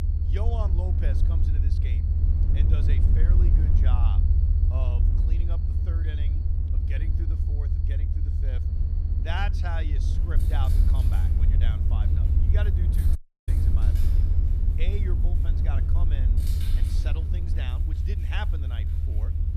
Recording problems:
low rumble; loud; throughout; 1 dB below the speech
animal sounds; noticeable; throughout; 15 dB below the speech
audio cutting out; at 13 s

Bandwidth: 14.5 kHz